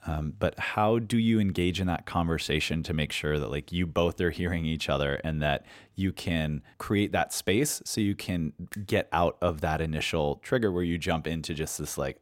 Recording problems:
none

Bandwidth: 16 kHz